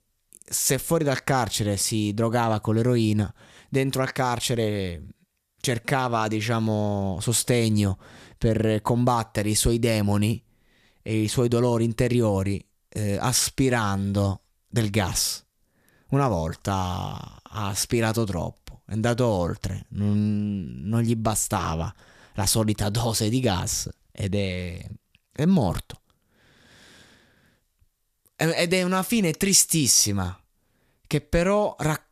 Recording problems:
none

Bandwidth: 14.5 kHz